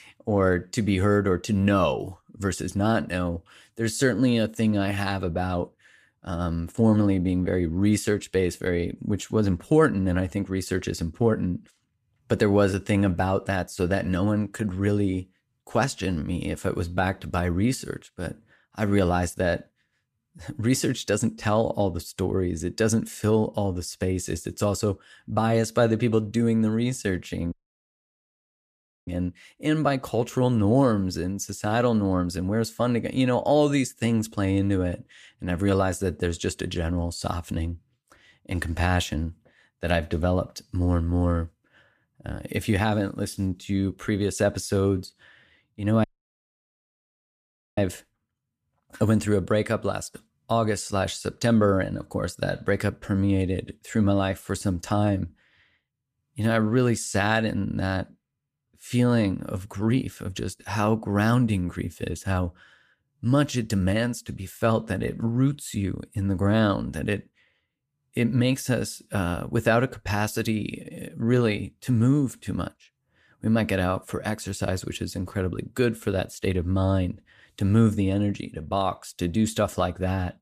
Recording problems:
audio cutting out; at 28 s for 1.5 s and at 46 s for 1.5 s

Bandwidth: 14.5 kHz